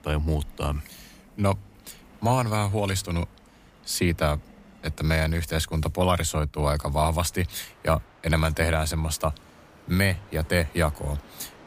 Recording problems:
train or aircraft noise; faint; throughout; 25 dB below the speech

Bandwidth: 15 kHz